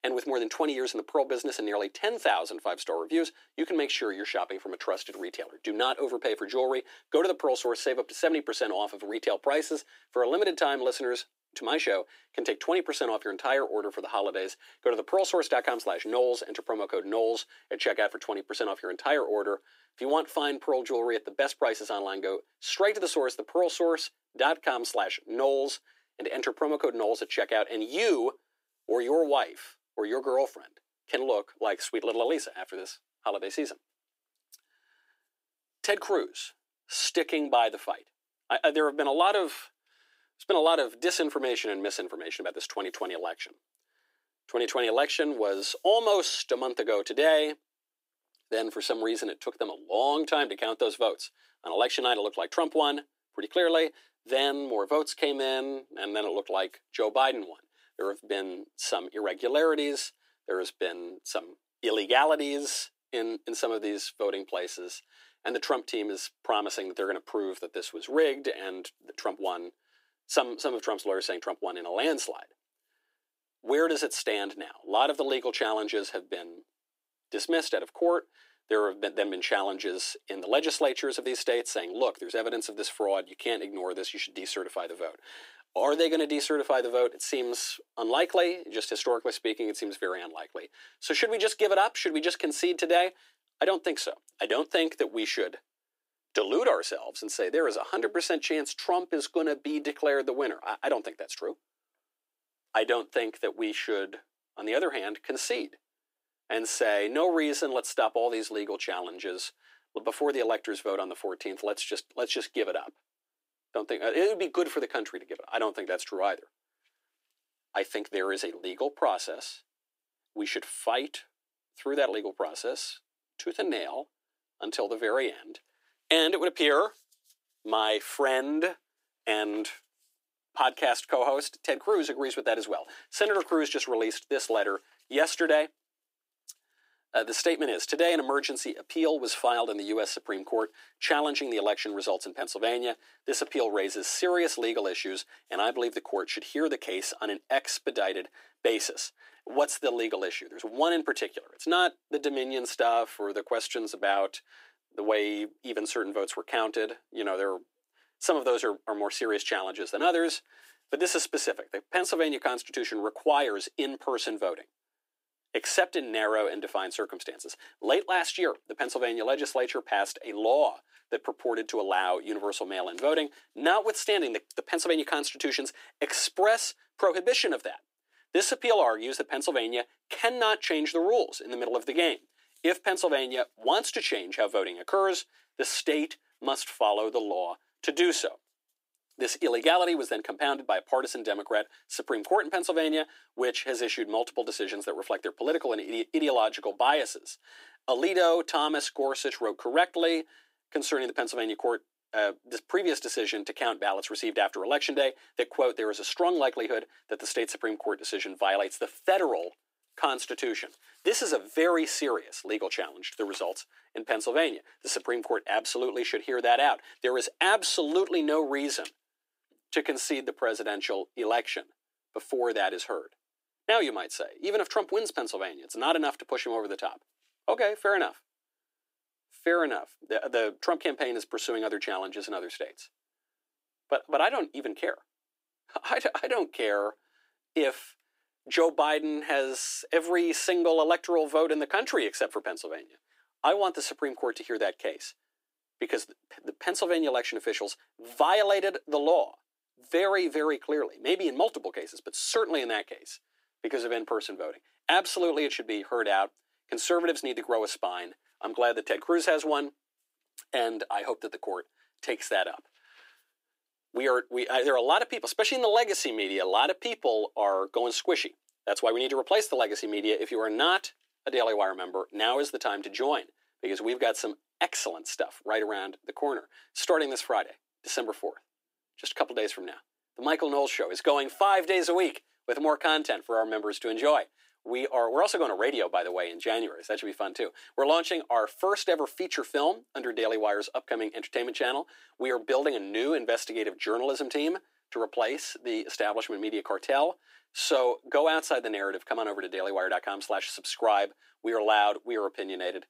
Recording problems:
thin; very; fading below 300 Hz

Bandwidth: 15.5 kHz